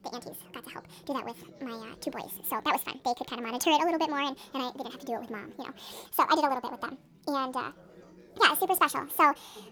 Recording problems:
wrong speed and pitch; too fast and too high; 1.6 times normal speed
background chatter; faint; throughout; 4 voices, 25 dB below the speech

